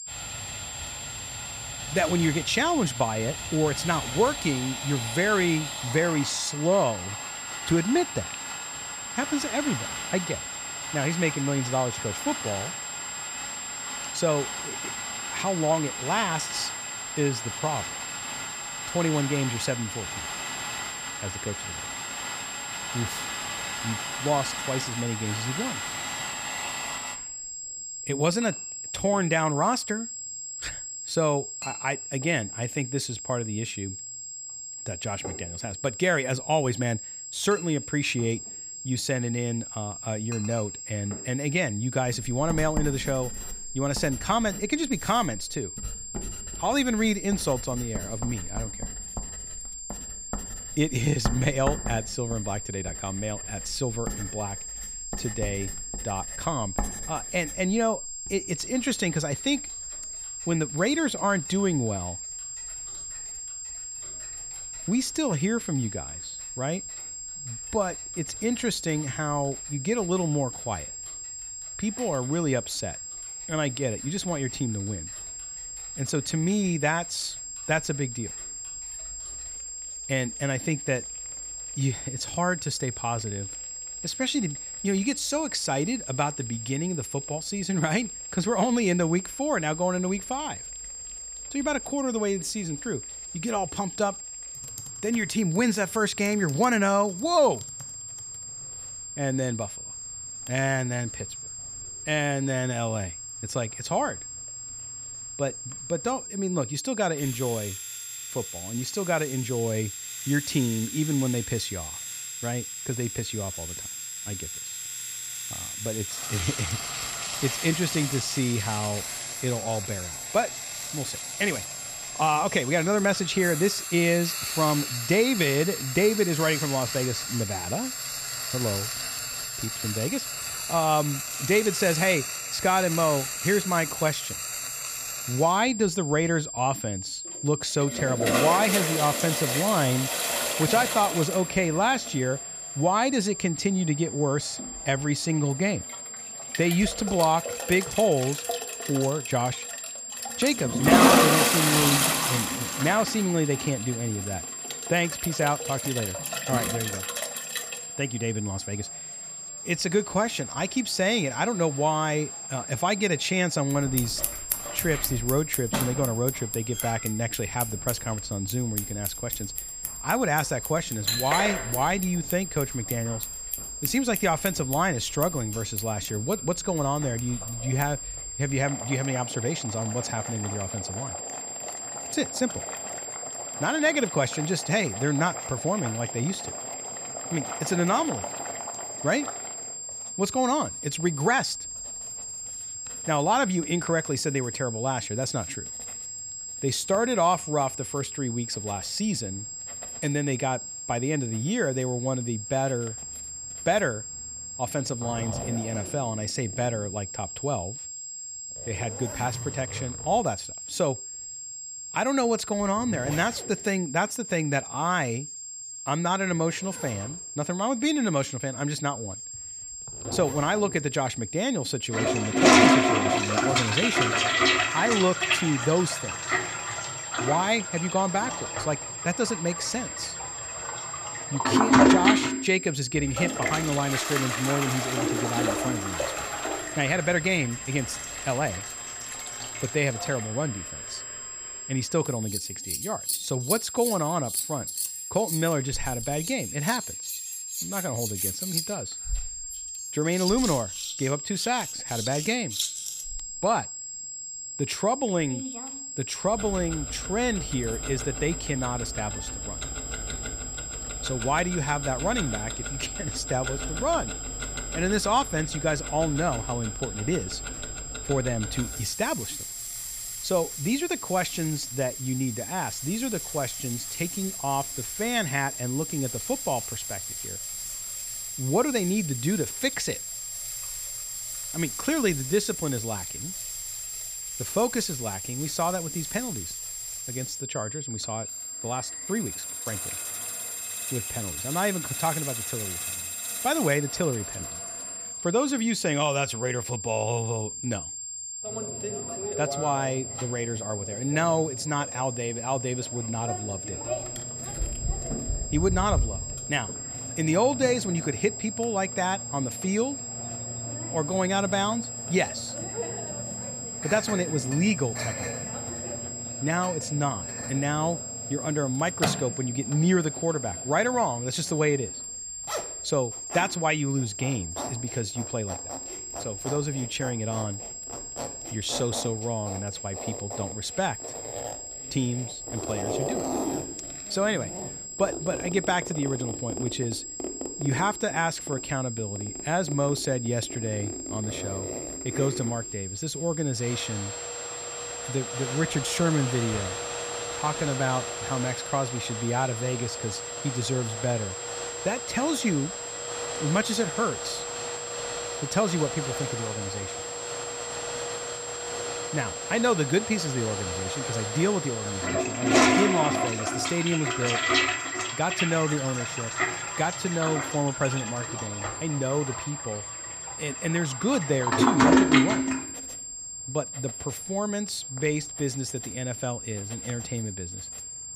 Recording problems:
high-pitched whine; loud; throughout; 7.5 kHz, 7 dB below the speech
household noises; loud; throughout; 4 dB below the speech

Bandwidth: 15 kHz